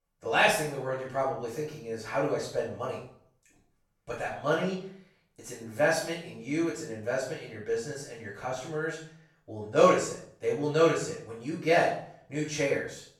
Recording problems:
off-mic speech; far
room echo; noticeable; dies away in 0.5 s

